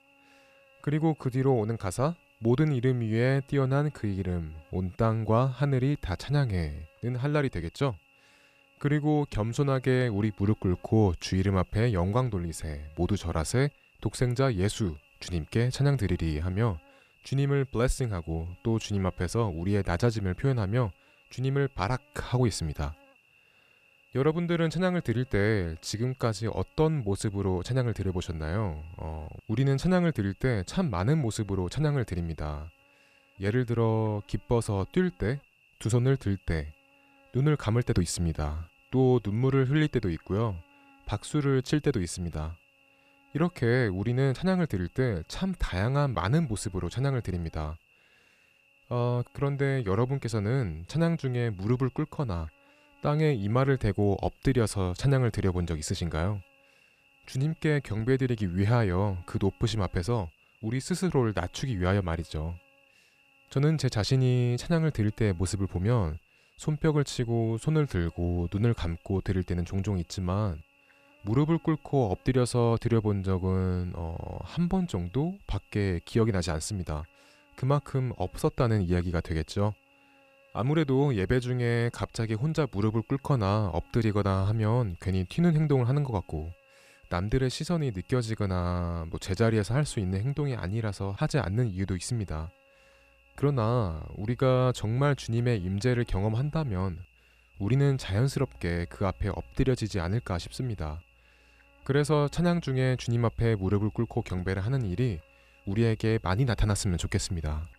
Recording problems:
electrical hum; very faint; throughout; 50 Hz, 25 dB below the speech

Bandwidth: 14.5 kHz